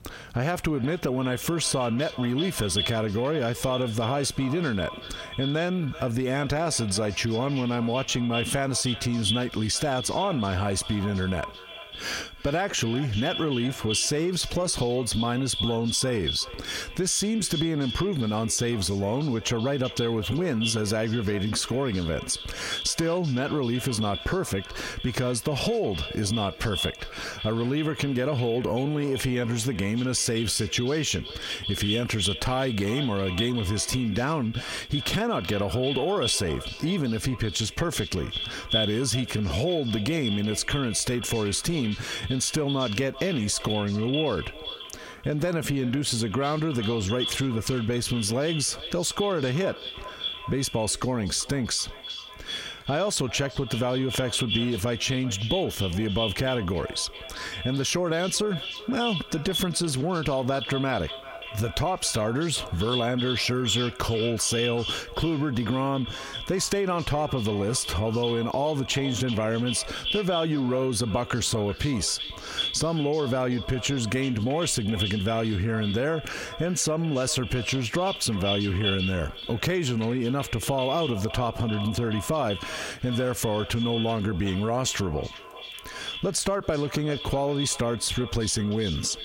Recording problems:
echo of what is said; strong; throughout; 390 ms later, 8 dB below the speech
squashed, flat; heavily

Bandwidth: 16 kHz